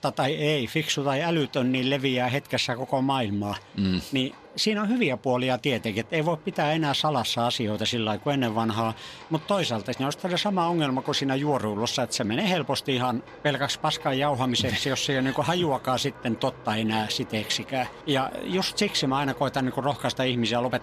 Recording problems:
animal sounds; noticeable; throughout; 20 dB below the speech

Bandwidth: 14.5 kHz